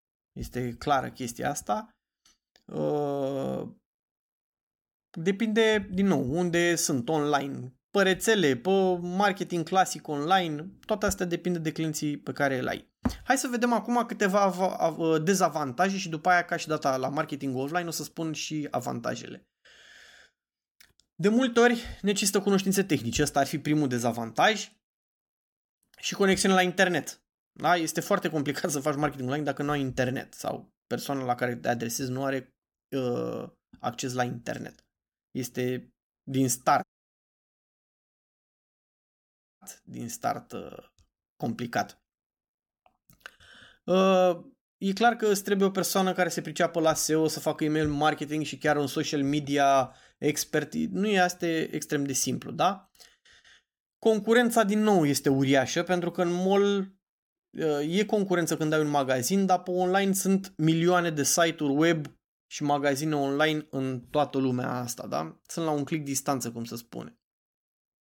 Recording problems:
audio cutting out; at 37 s for 3 s

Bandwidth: 17.5 kHz